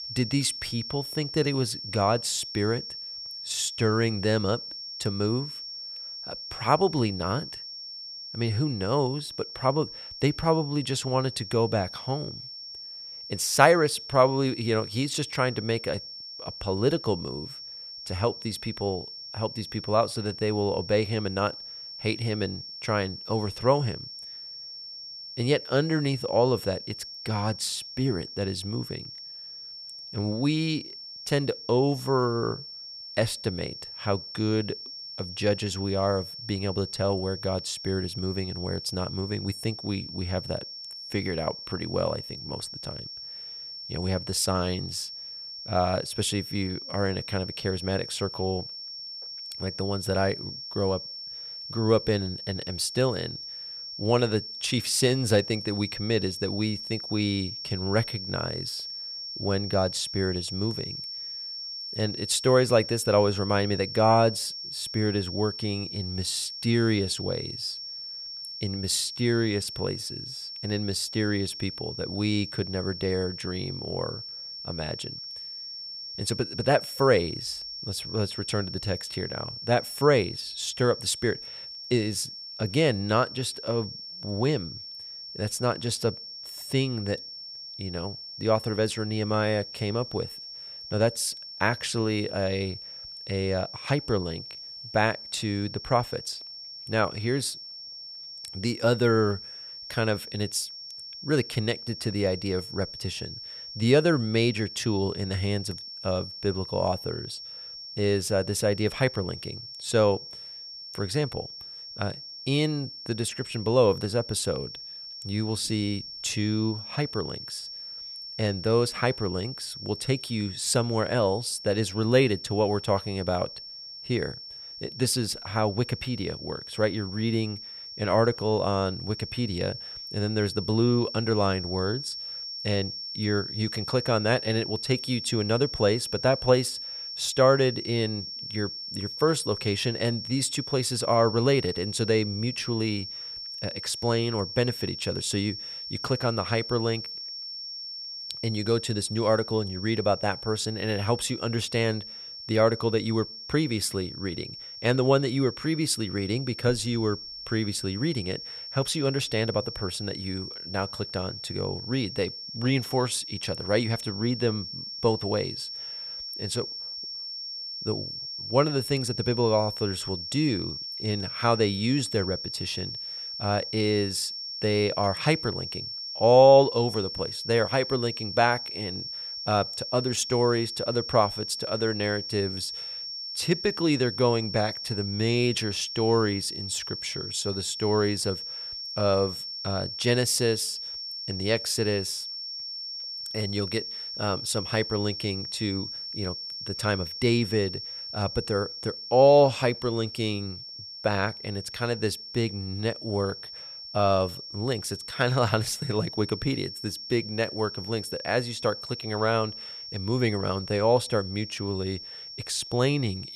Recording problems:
high-pitched whine; loud; throughout; 5.5 kHz, 8 dB below the speech

